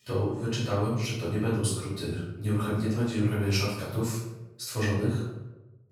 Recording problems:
off-mic speech; far
room echo; noticeable; dies away in 0.8 s

